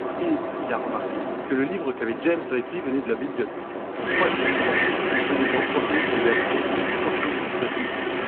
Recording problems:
phone-call audio
wind in the background; very loud; throughout; 3 dB above the speech

